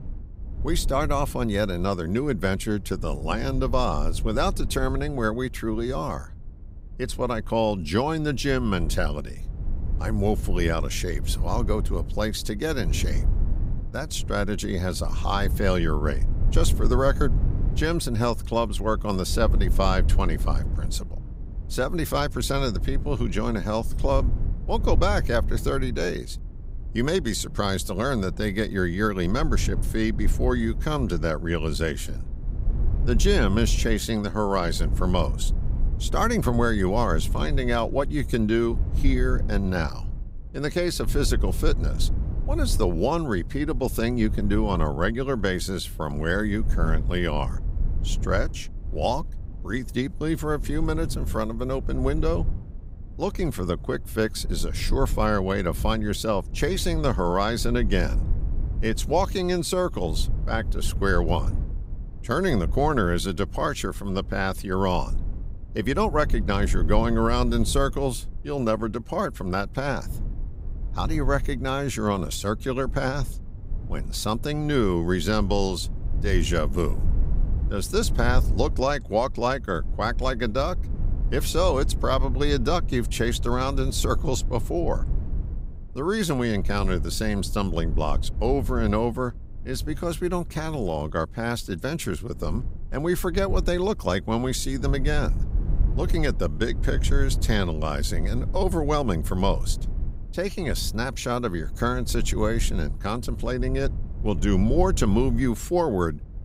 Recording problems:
low rumble; noticeable; throughout; 20 dB below the speech

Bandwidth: 15.5 kHz